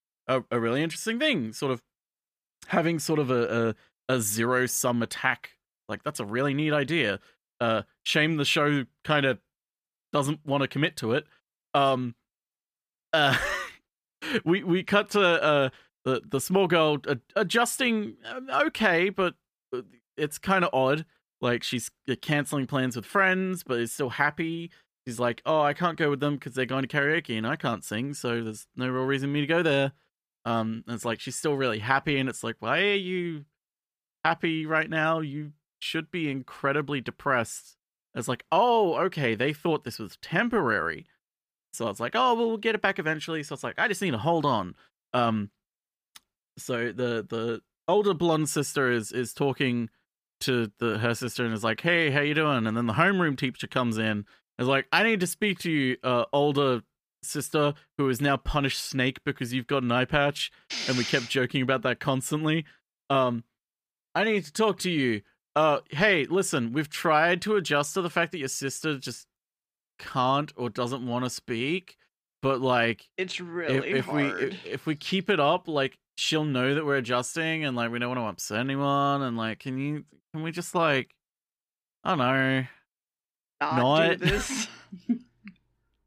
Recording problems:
none

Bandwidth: 15 kHz